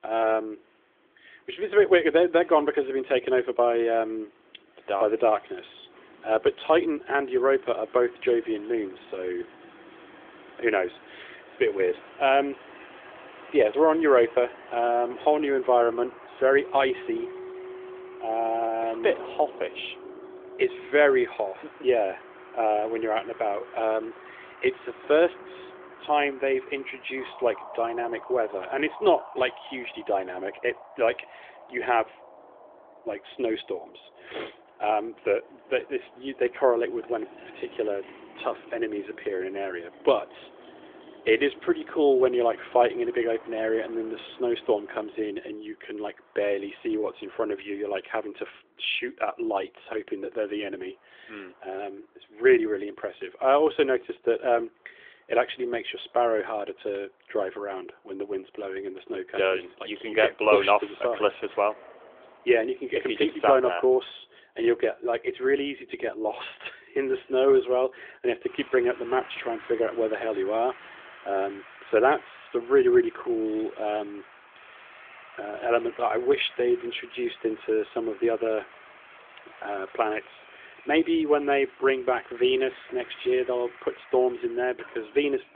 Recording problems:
phone-call audio; nothing above 3.5 kHz
traffic noise; faint; throughout; 20 dB below the speech

